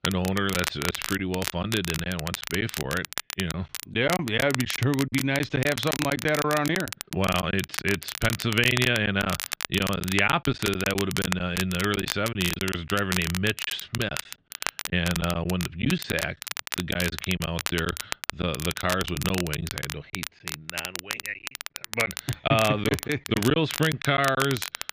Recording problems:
muffled; slightly; fading above 3.5 kHz
crackle, like an old record; loud; 6 dB below the speech
choppy; very; 9% of the speech affected

